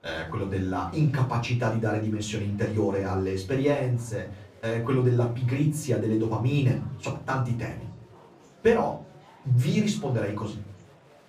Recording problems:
off-mic speech; far
room echo; slight; dies away in 0.4 s
murmuring crowd; faint; throughout; 25 dB below the speech

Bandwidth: 15.5 kHz